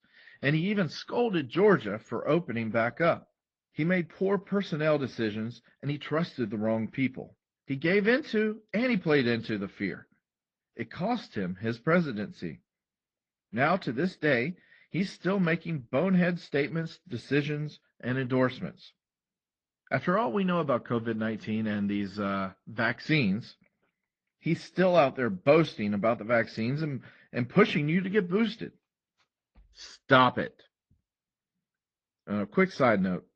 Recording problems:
garbled, watery; slightly; nothing above 8 kHz
muffled; very slightly; fading above 4.5 kHz

